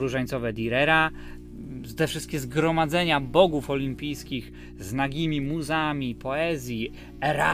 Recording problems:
electrical hum; faint; throughout; 60 Hz, 25 dB below the speech
abrupt cut into speech; at the start and the end

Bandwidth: 15 kHz